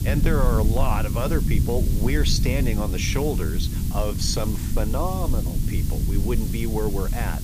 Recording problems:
hiss; loud; throughout; 10 dB below the speech
low rumble; loud; throughout; 9 dB below the speech

